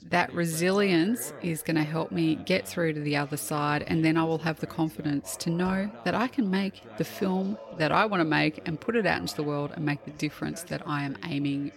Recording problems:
background chatter; noticeable; throughout; 2 voices, 20 dB below the speech

